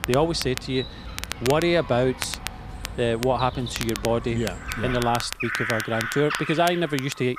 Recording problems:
animal sounds; loud; throughout; 9 dB below the speech
crackle, like an old record; noticeable; 10 dB below the speech

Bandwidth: 14.5 kHz